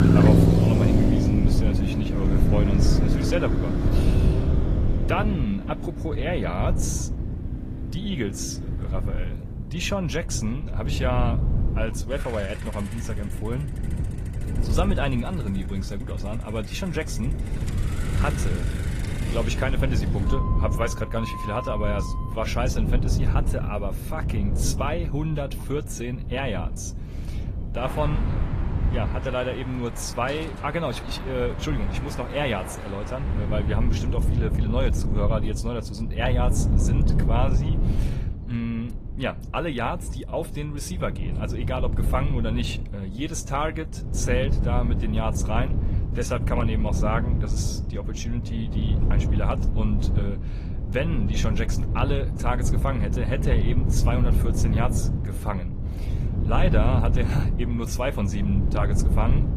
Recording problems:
garbled, watery; slightly; nothing above 14.5 kHz
traffic noise; very loud; until 34 s; 2 dB above the speech
wind noise on the microphone; heavy; 8 dB below the speech

